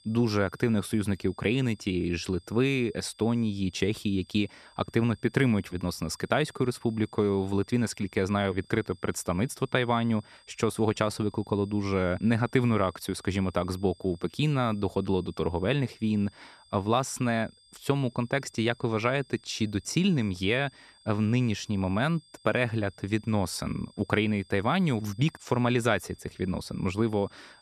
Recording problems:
high-pitched whine; faint; throughout; 5 kHz, 30 dB below the speech

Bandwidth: 13.5 kHz